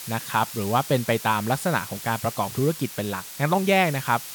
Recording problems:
hiss; noticeable; throughout; 10 dB below the speech

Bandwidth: 18.5 kHz